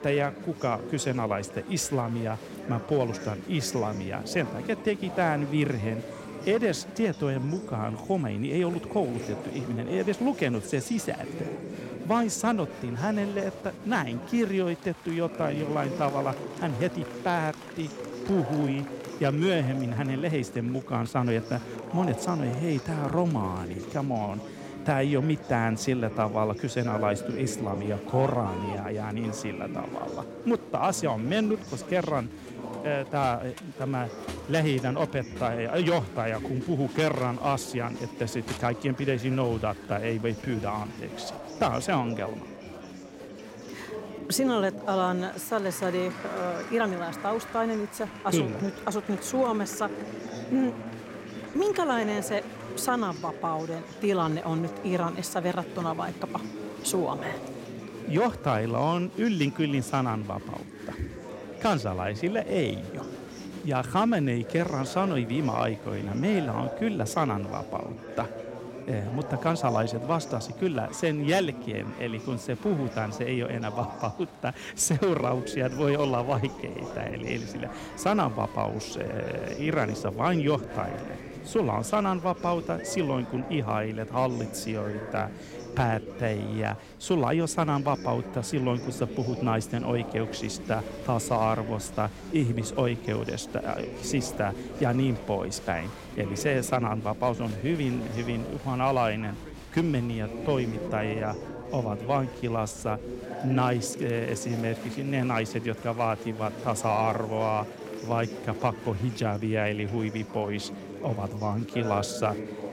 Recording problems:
chatter from many people; loud; throughout; 10 dB below the speech

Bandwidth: 16 kHz